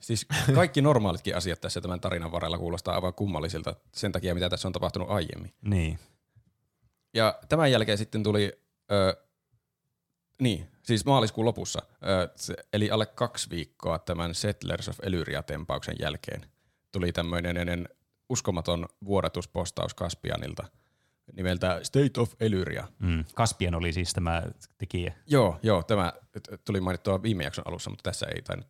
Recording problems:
audio stuttering; at 17 s

